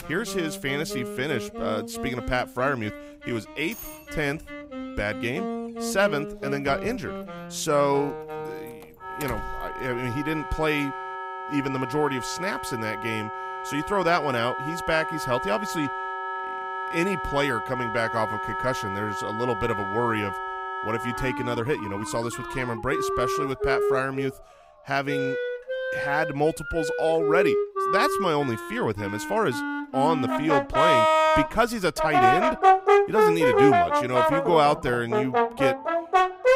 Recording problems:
background music; very loud; throughout; as loud as the speech
alarms or sirens; noticeable; throughout; 20 dB below the speech

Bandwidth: 15.5 kHz